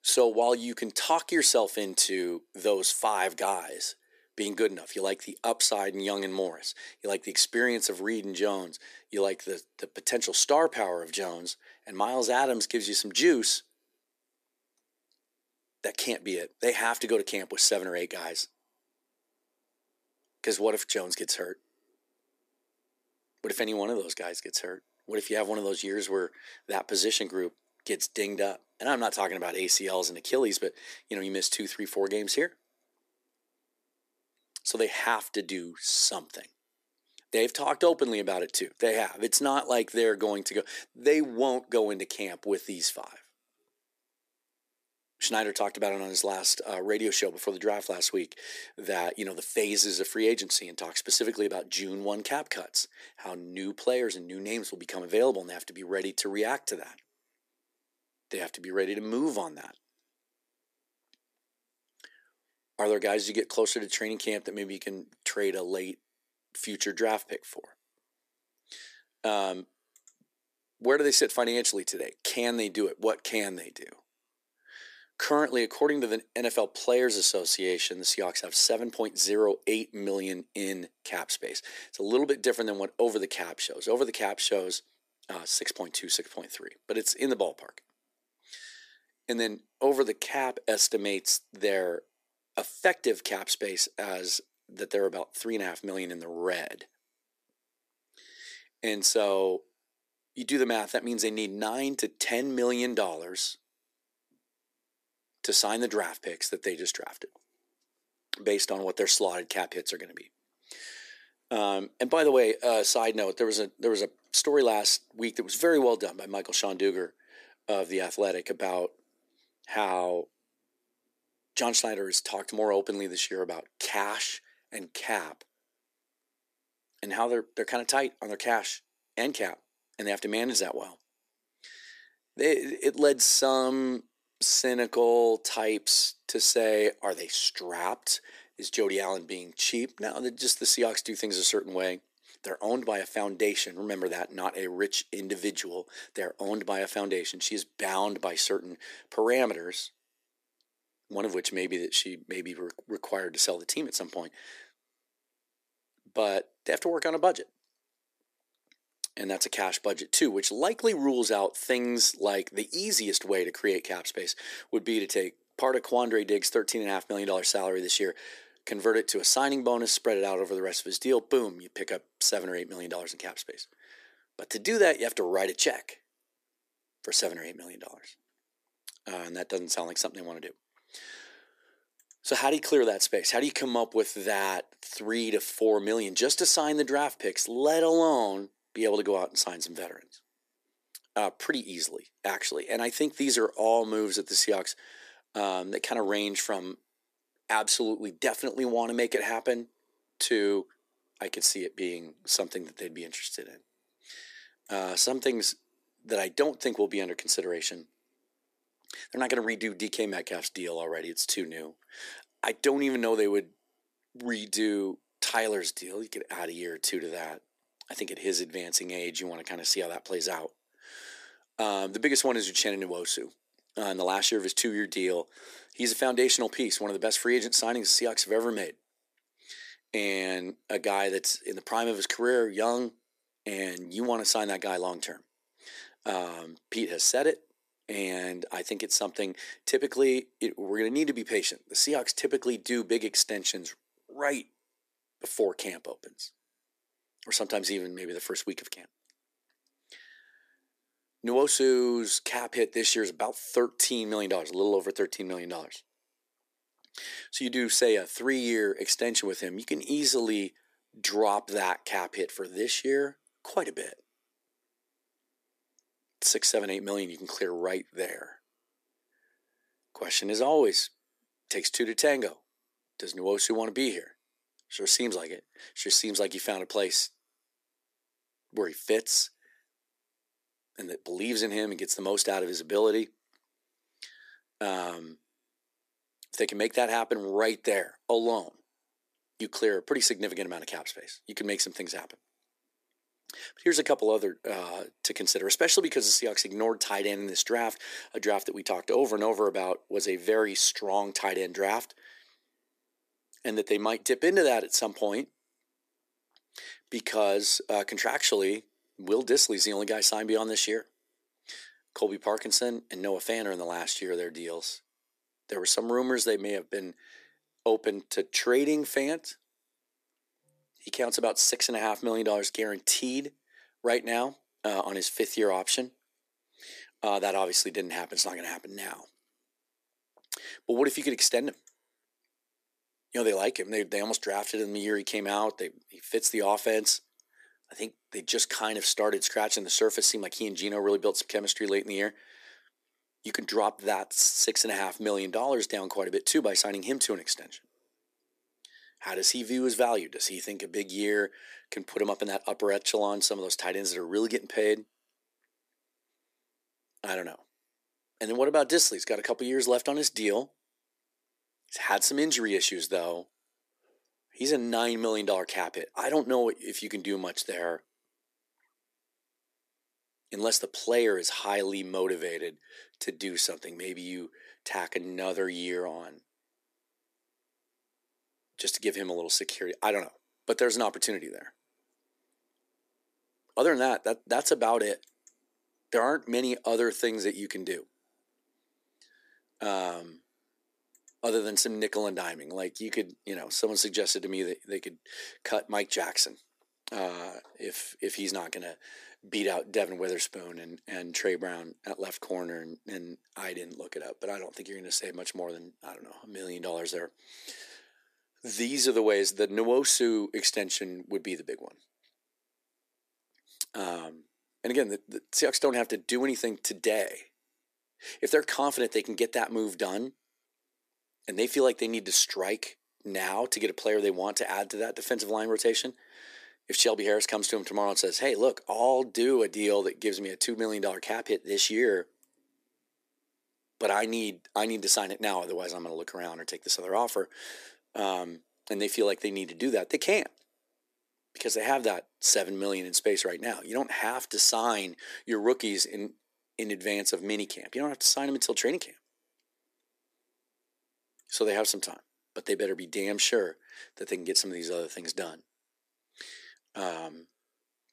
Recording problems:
thin; very; fading below 300 Hz

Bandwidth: 14.5 kHz